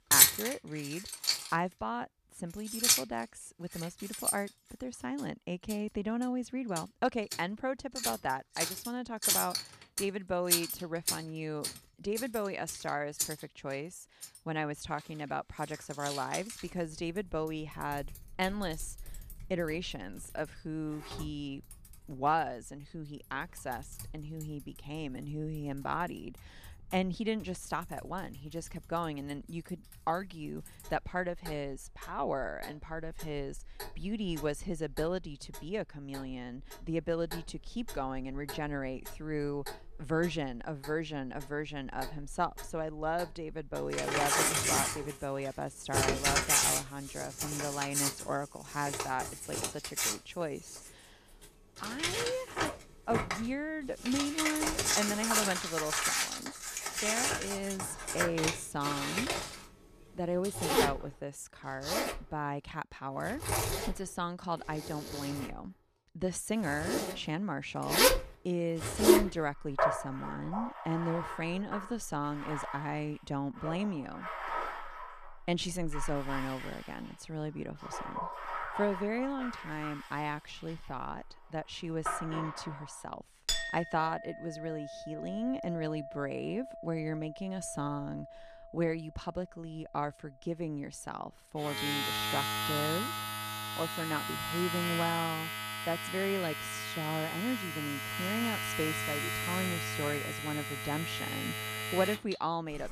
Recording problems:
household noises; very loud; throughout; 4 dB above the speech

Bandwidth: 14.5 kHz